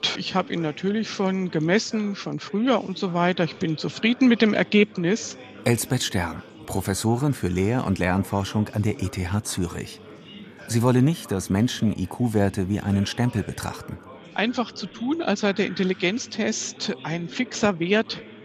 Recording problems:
background chatter; noticeable; throughout; 3 voices, 20 dB below the speech

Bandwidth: 14.5 kHz